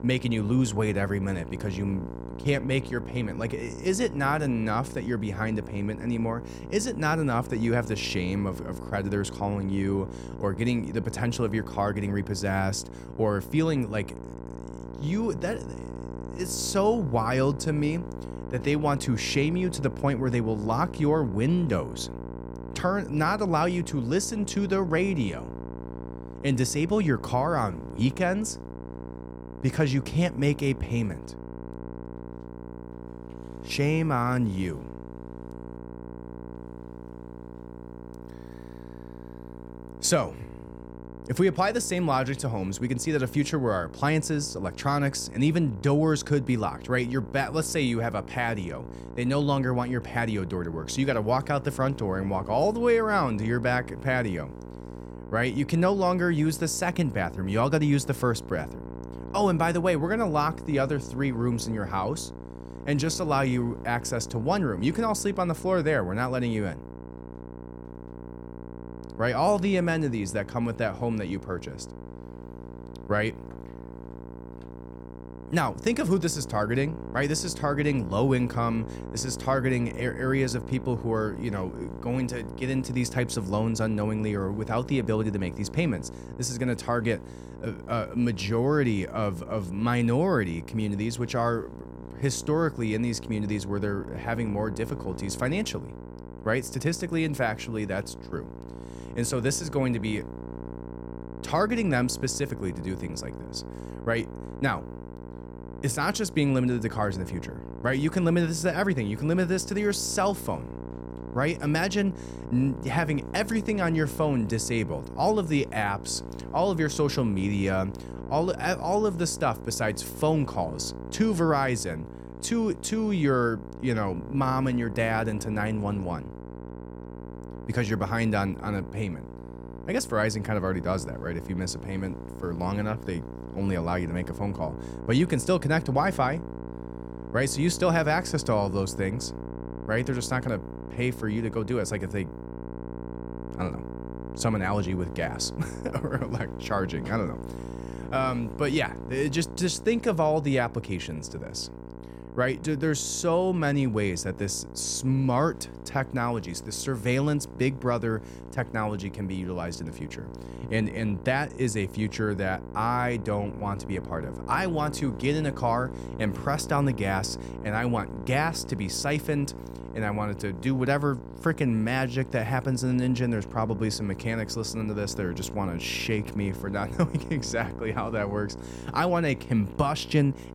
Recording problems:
electrical hum; noticeable; throughout; 60 Hz, 15 dB below the speech

